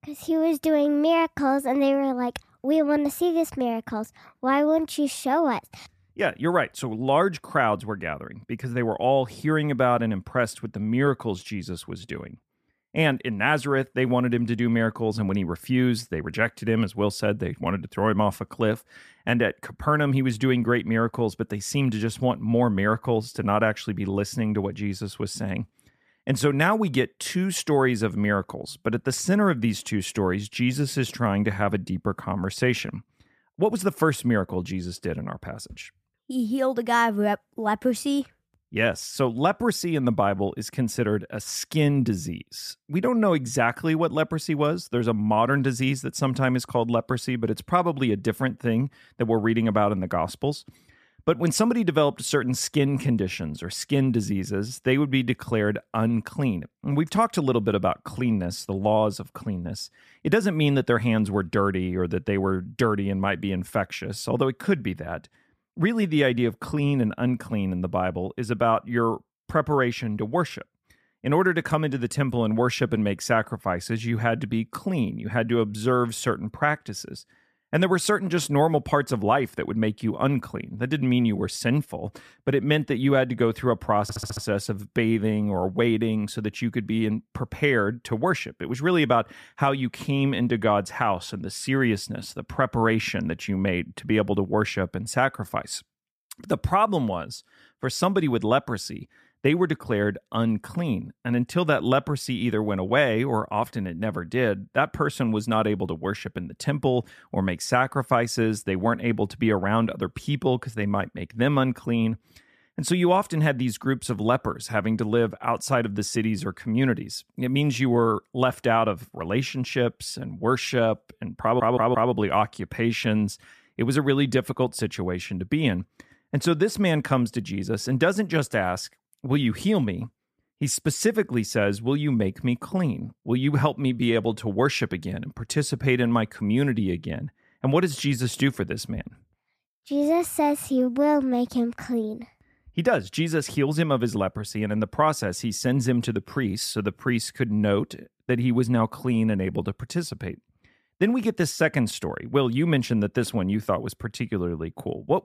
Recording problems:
audio stuttering; at 1:24 and at 2:01

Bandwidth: 14.5 kHz